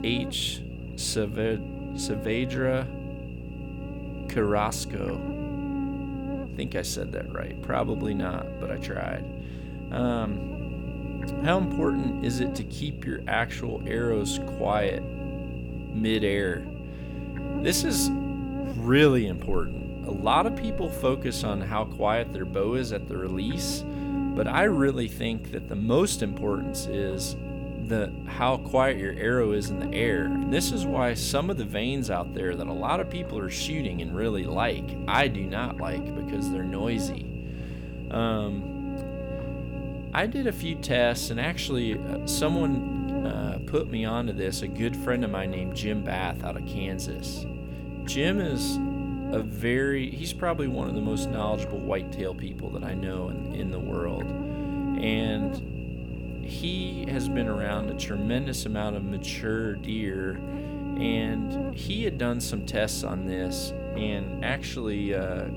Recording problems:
electrical hum; loud; throughout; 60 Hz, 9 dB below the speech

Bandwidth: 18.5 kHz